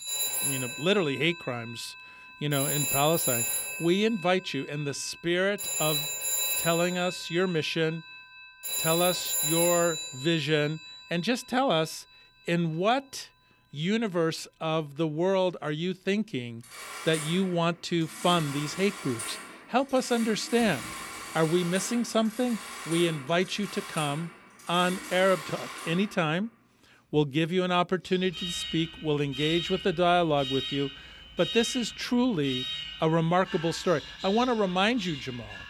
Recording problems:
alarms or sirens; loud; throughout; 5 dB below the speech

